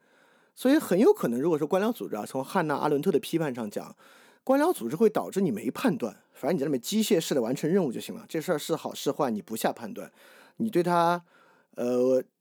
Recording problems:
none

